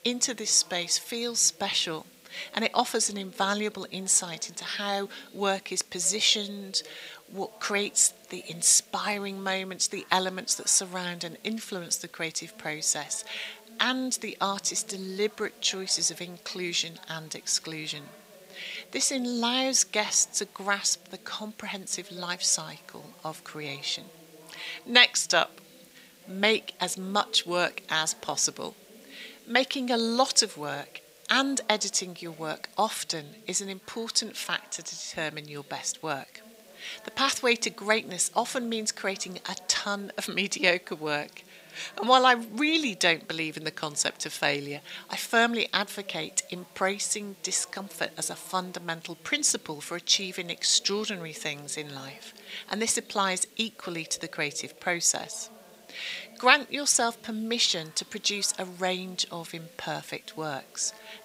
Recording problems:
thin; somewhat; fading below 650 Hz
voice in the background; faint; throughout; 25 dB below the speech
hiss; faint; throughout; 30 dB below the speech

